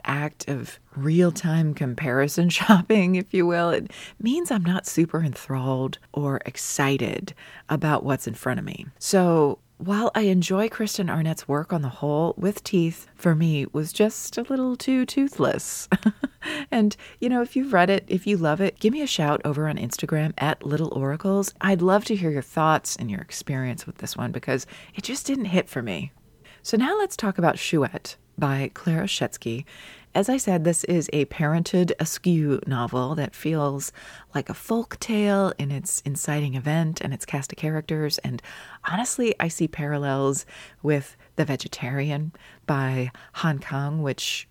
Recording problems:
none

